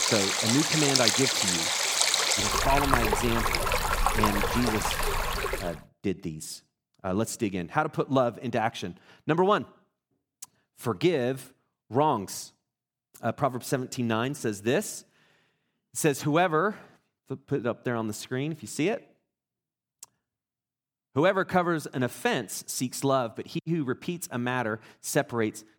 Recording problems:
rain or running water; very loud; until 5.5 s; 4 dB above the speech

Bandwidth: 19 kHz